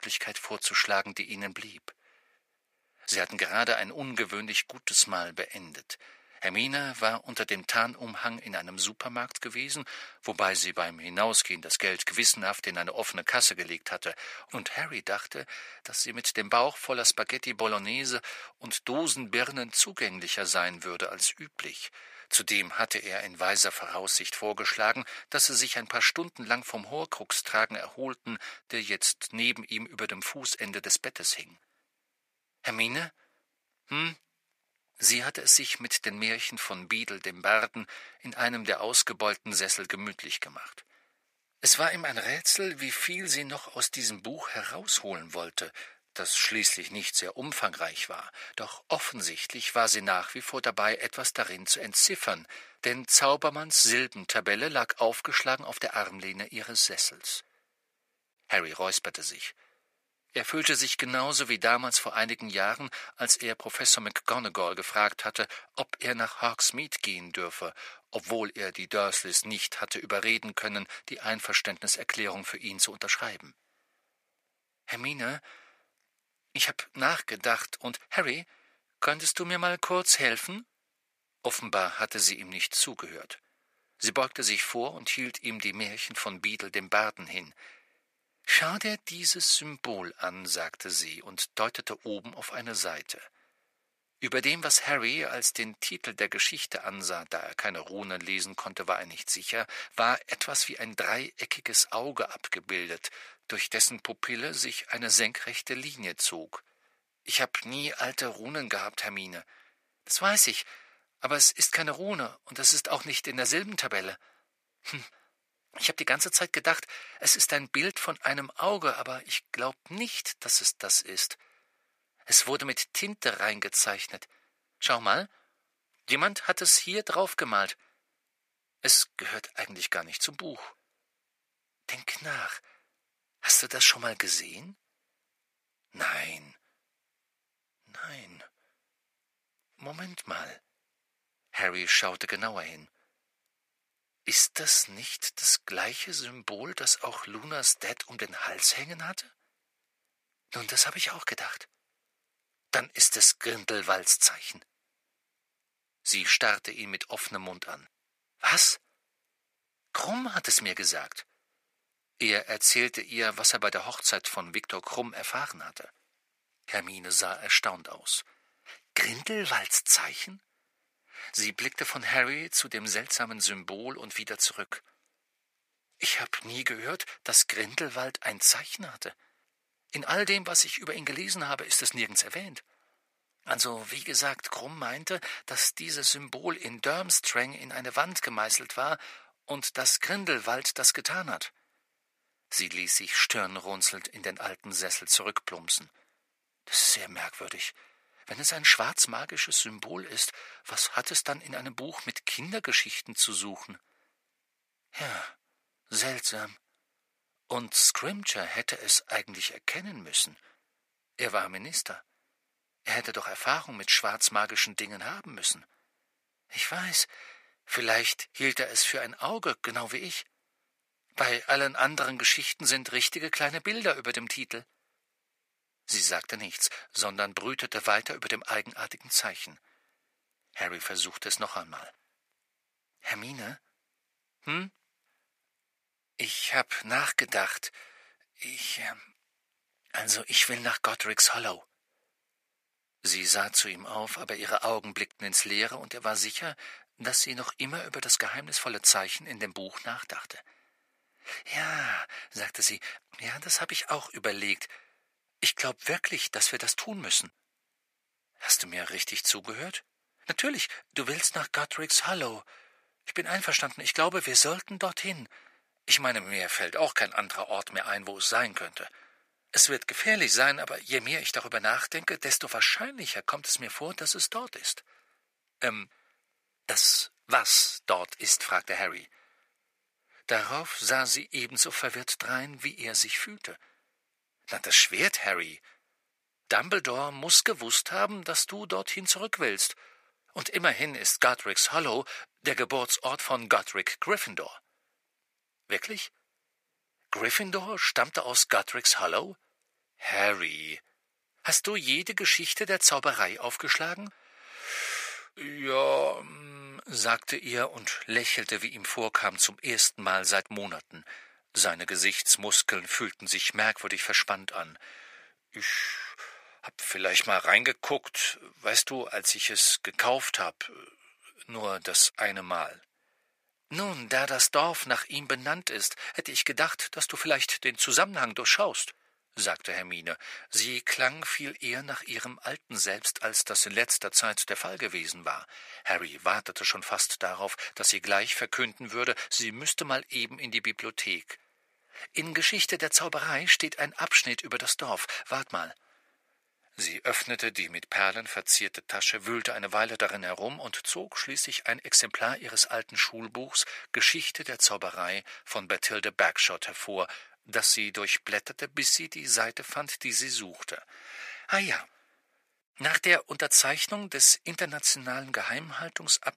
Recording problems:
thin; very; fading below 550 Hz

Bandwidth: 15 kHz